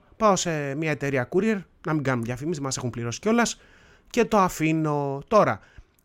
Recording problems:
none

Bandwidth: 16 kHz